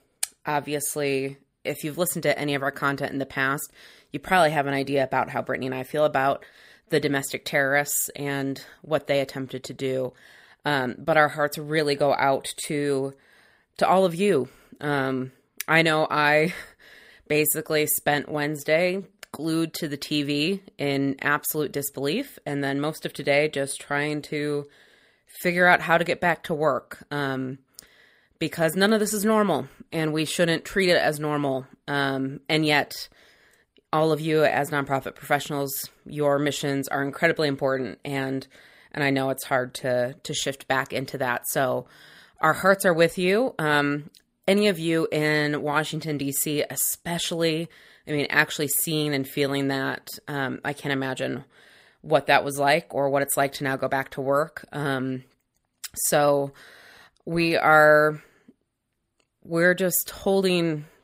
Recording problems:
none

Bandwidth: 15.5 kHz